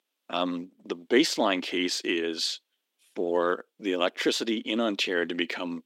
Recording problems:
thin; somewhat; fading below 300 Hz

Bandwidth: 16 kHz